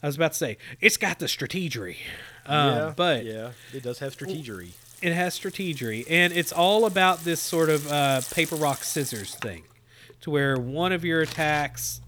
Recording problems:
household noises; noticeable; throughout; 15 dB below the speech

